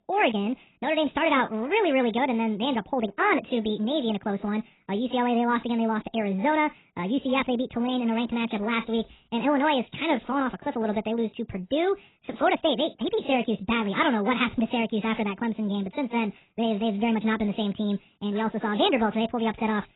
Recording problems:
garbled, watery; badly; nothing above 4 kHz
wrong speed and pitch; too fast and too high; 1.5 times normal speed

